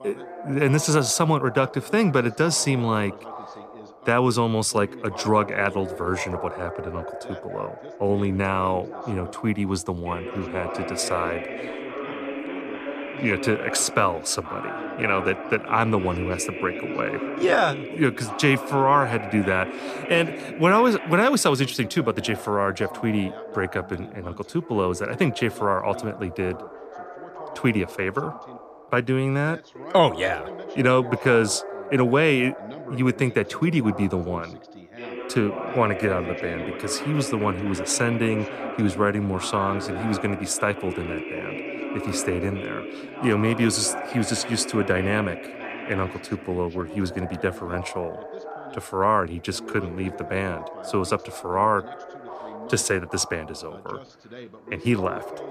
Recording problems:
background chatter; noticeable; throughout; 2 voices, 10 dB below the speech

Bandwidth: 14.5 kHz